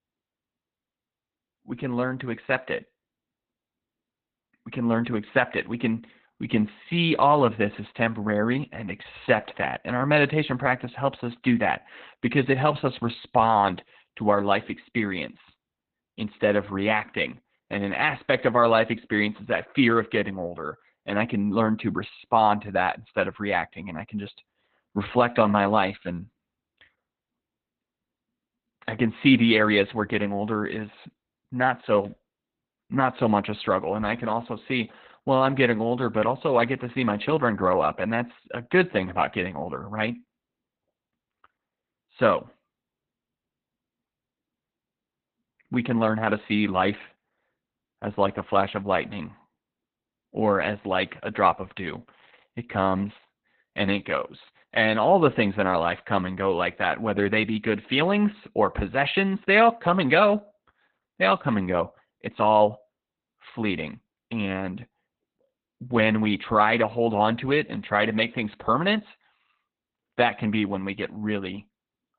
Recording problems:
garbled, watery; badly; nothing above 4 kHz

